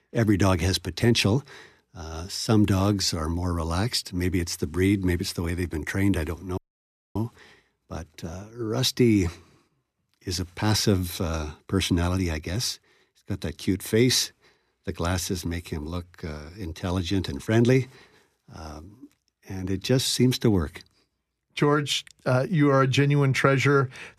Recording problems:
audio cutting out; at 6.5 s for 0.5 s

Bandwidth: 14 kHz